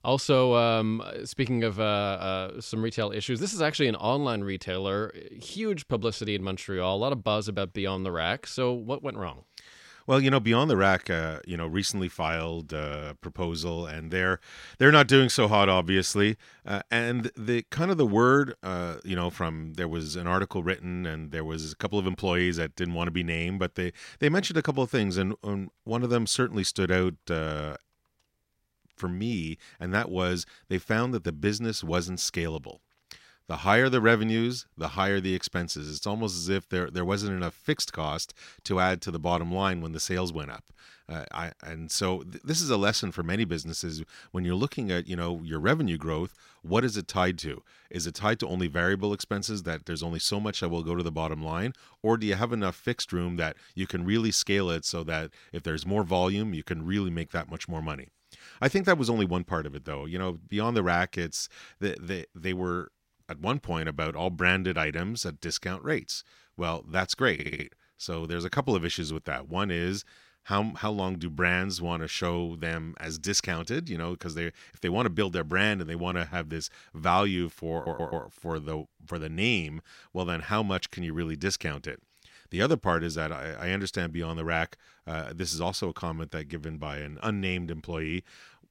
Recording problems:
audio stuttering; at 1:07 and at 1:18

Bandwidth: 16 kHz